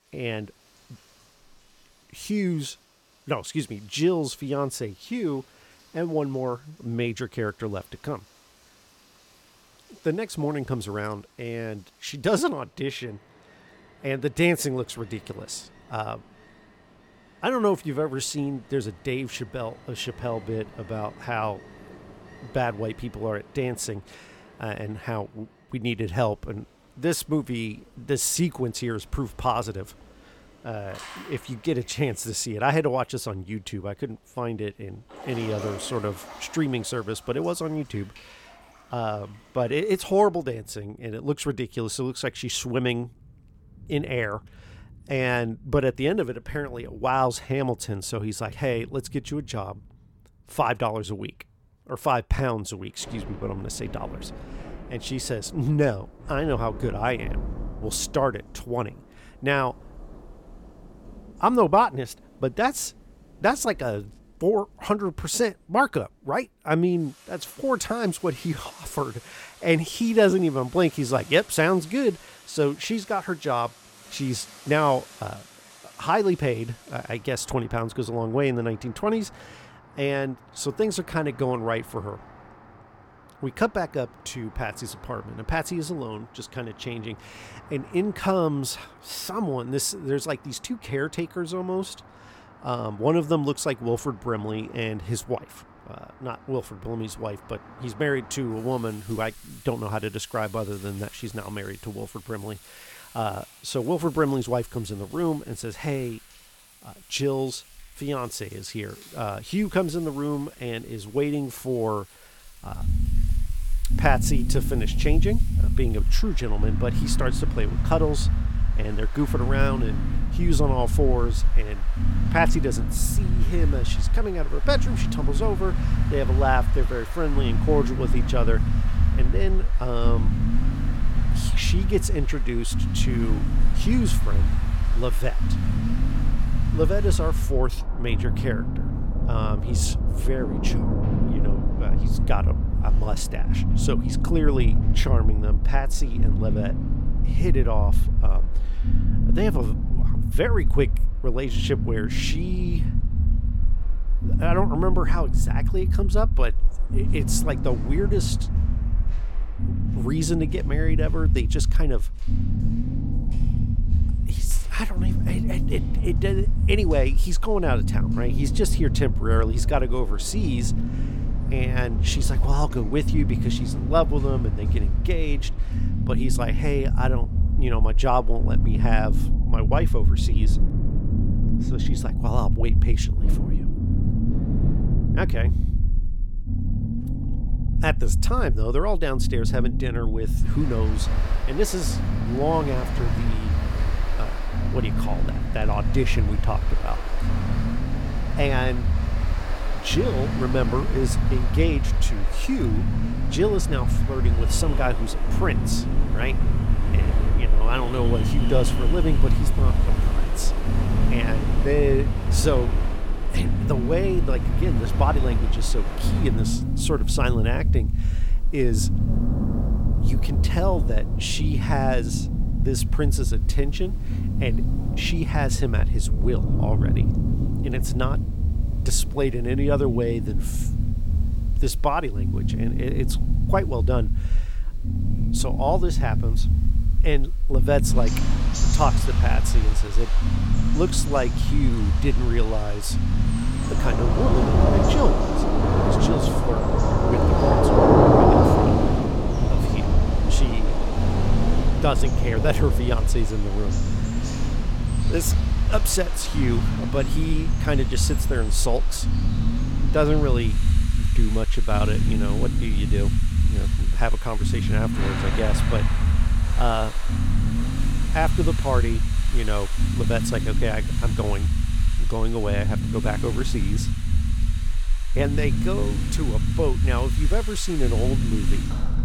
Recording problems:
rain or running water; loud; throughout; 4 dB below the speech
low rumble; loud; from 1:53 on; 10 dB below the speech

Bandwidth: 17 kHz